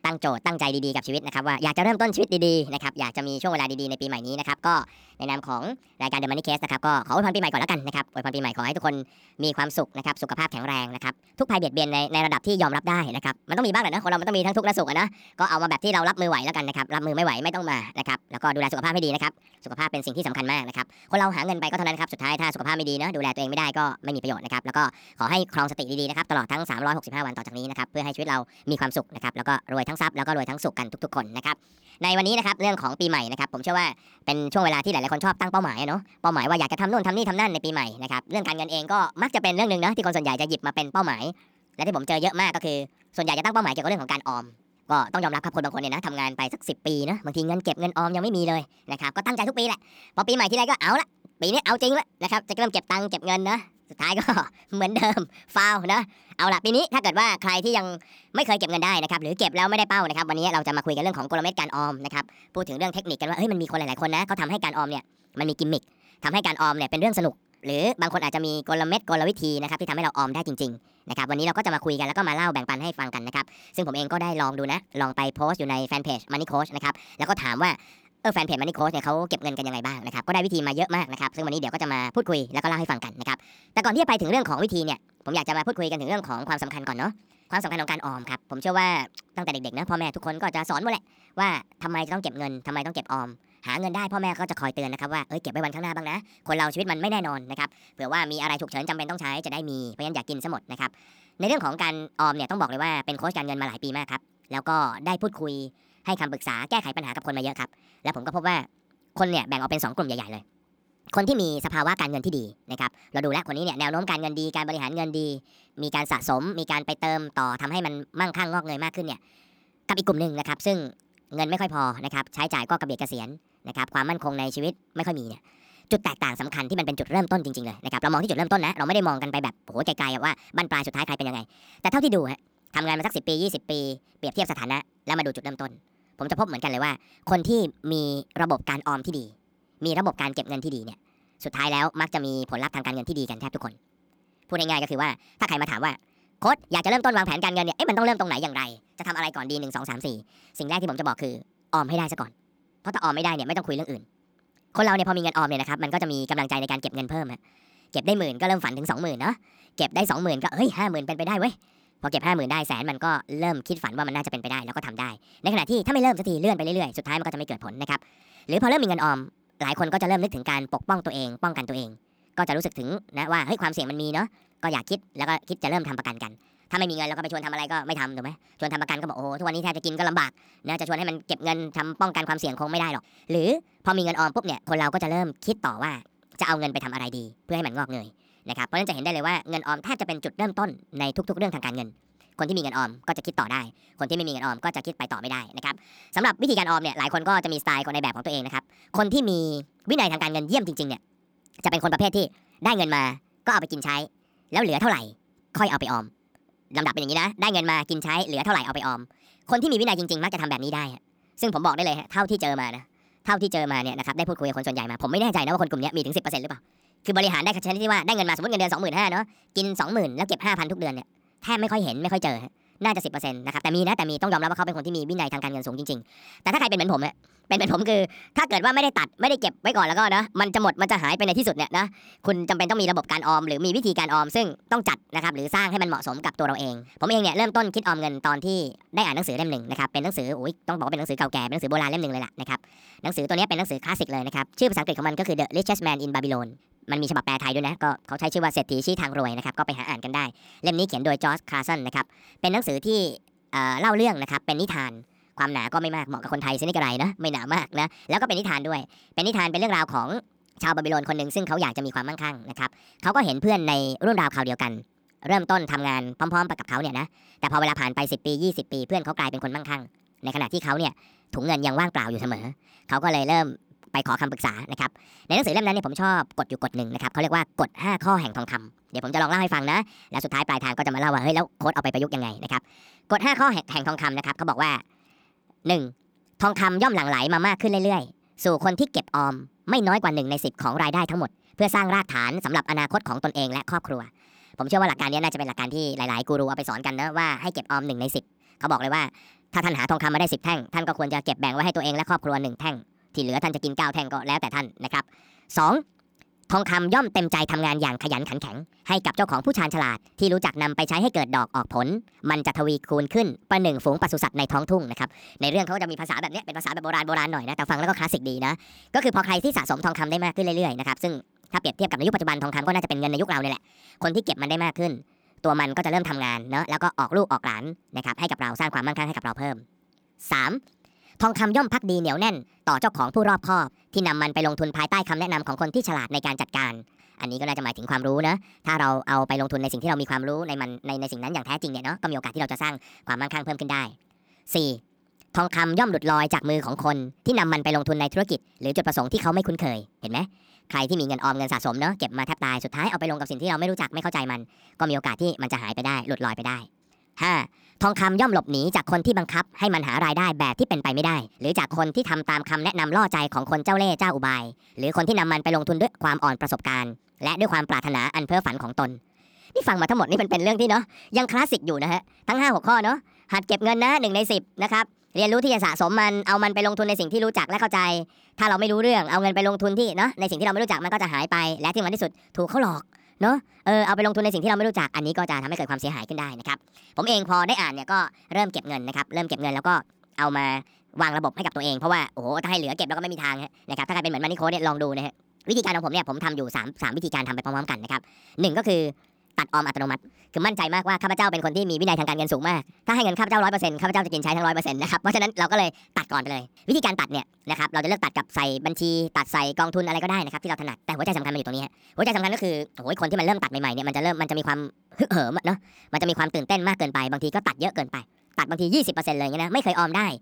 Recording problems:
wrong speed and pitch; too fast and too high; 1.5 times normal speed

